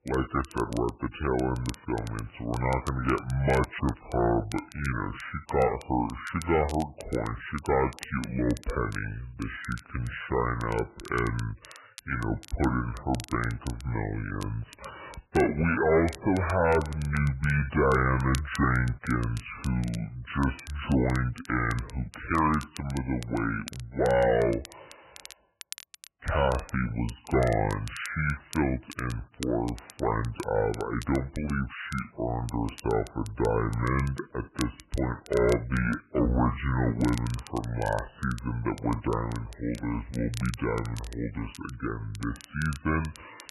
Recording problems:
garbled, watery; badly; nothing above 3 kHz
wrong speed and pitch; too slow and too low; 0.6 times normal speed
distortion; slight; 2% of the sound clipped
crackle, like an old record; noticeable; 20 dB below the speech

